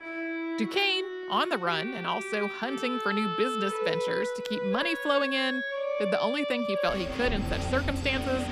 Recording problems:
background music; loud; throughout; 3 dB below the speech

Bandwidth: 14.5 kHz